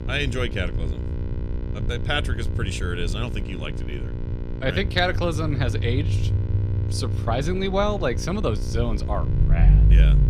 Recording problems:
electrical hum; noticeable; throughout; 60 Hz, 15 dB below the speech
low rumble; noticeable; throughout; 15 dB below the speech

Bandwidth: 14.5 kHz